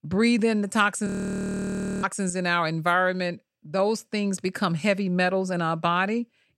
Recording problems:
audio freezing; at 1 s for 1 s

